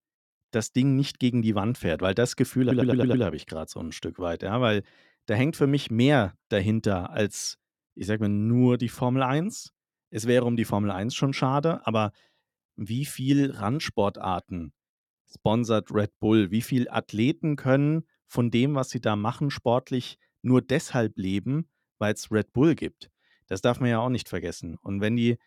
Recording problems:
audio stuttering; at 2.5 s

